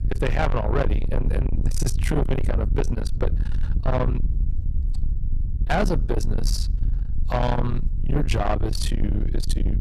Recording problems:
distortion; heavy; 7 dB below the speech
low rumble; loud; throughout; 7 dB below the speech

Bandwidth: 13.5 kHz